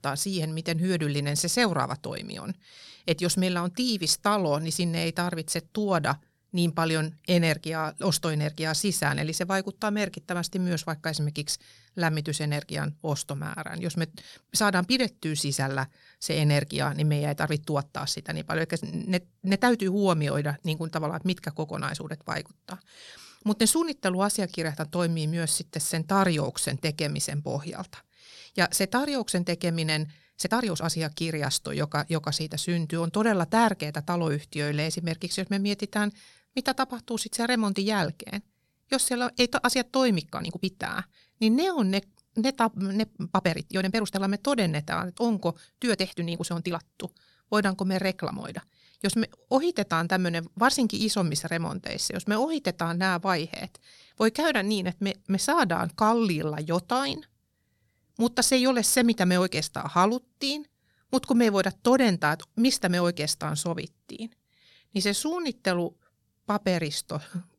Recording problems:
uneven, jittery; strongly; from 14 s to 1:06

